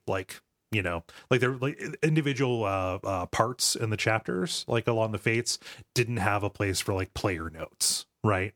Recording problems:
none

